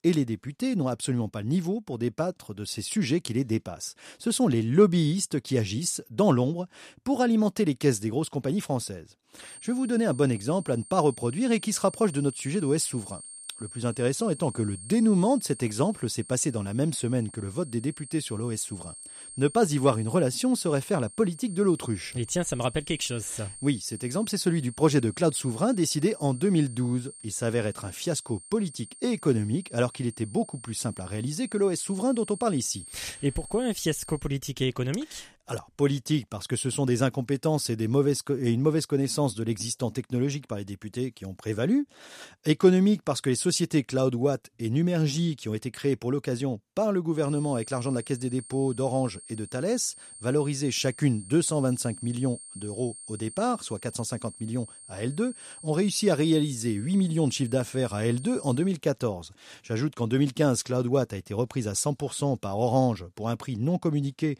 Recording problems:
high-pitched whine; noticeable; from 9.5 to 34 s and from 47 to 59 s; 8.5 kHz, 15 dB below the speech

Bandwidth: 14.5 kHz